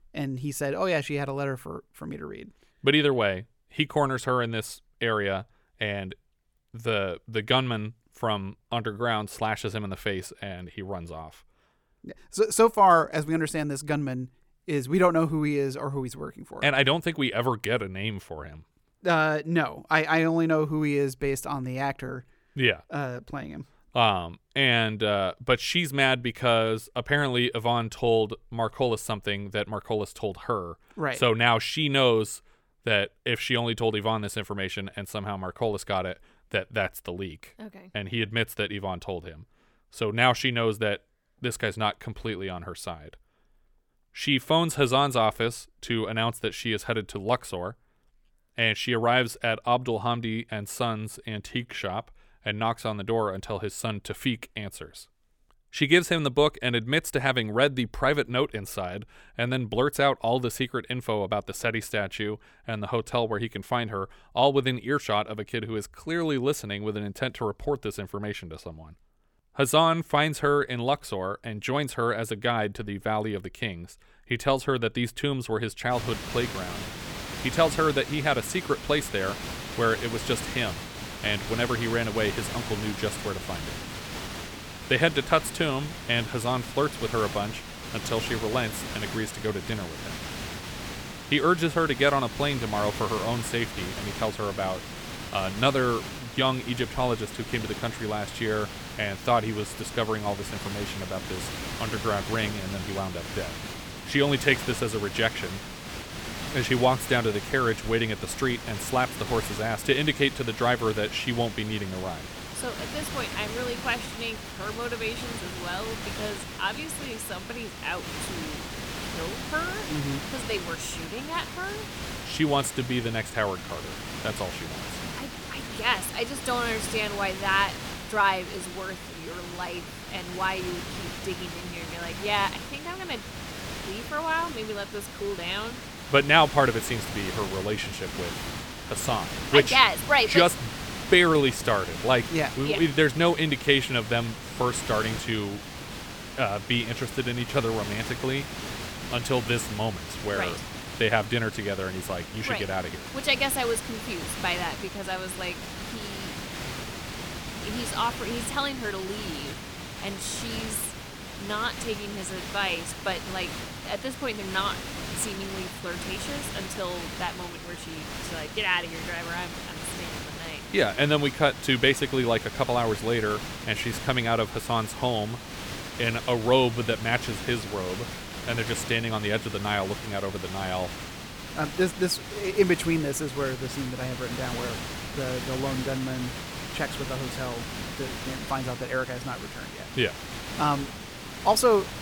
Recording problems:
hiss; loud; from 1:16 on; 9 dB below the speech

